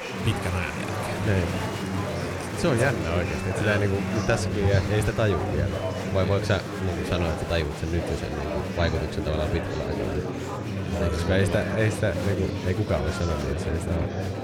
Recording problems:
murmuring crowd; loud; throughout; 3 dB below the speech

